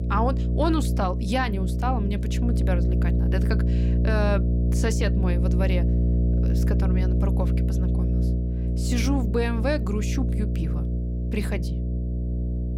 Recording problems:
electrical hum; loud; throughout; 60 Hz, 6 dB below the speech

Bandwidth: 16 kHz